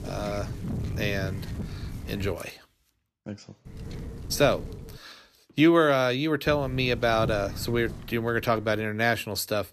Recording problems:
wind noise on the microphone; occasional gusts; until 2.5 s, from 3.5 to 5 s and from 6.5 to 9 s; 20 dB below the speech

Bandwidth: 14.5 kHz